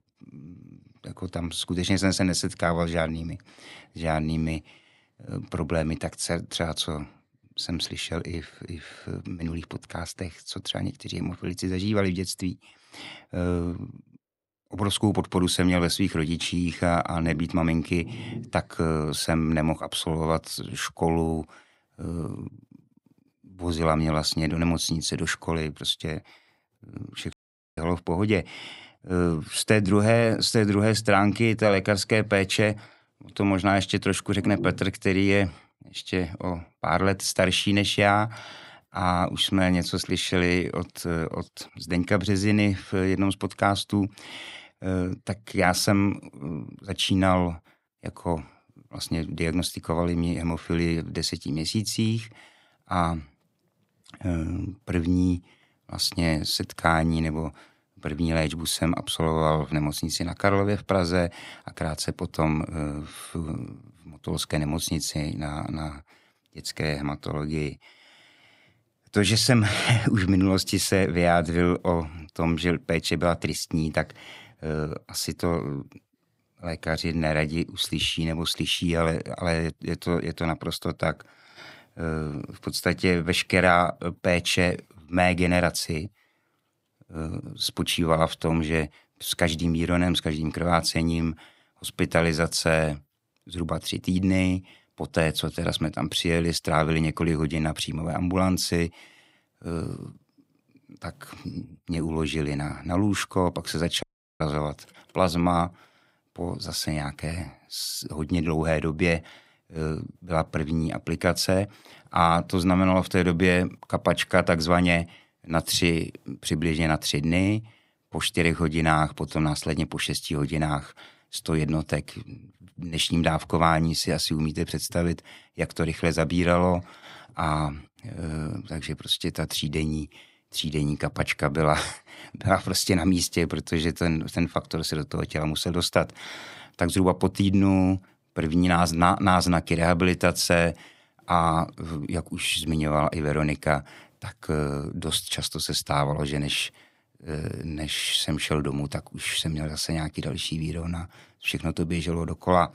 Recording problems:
audio cutting out; at 27 s and at 1:44

